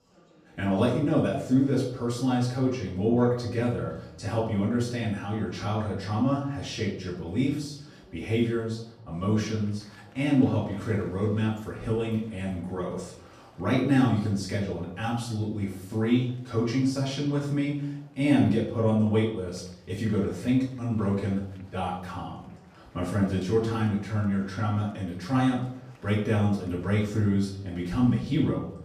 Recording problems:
off-mic speech; far
room echo; noticeable; dies away in 0.6 s
murmuring crowd; faint; throughout; 30 dB below the speech

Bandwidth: 14.5 kHz